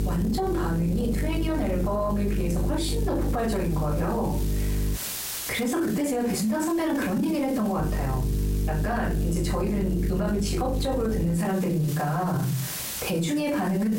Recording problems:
off-mic speech; far
room echo; slight; dies away in 0.3 s
squashed, flat; somewhat
electrical hum; noticeable; until 5 s and from 8 to 11 s; 50 Hz, 10 dB below the speech
hiss; noticeable; throughout; 10 dB below the speech

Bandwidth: 16 kHz